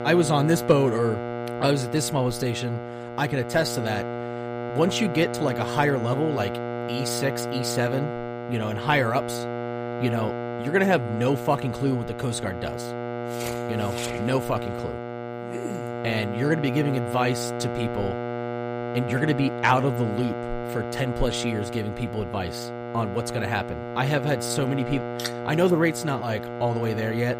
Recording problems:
electrical hum; loud; throughout; 60 Hz, 5 dB below the speech

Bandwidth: 15 kHz